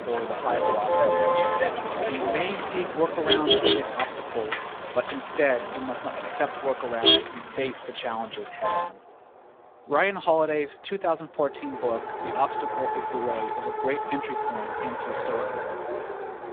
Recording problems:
phone-call audio; poor line
traffic noise; very loud; throughout; 2 dB above the speech

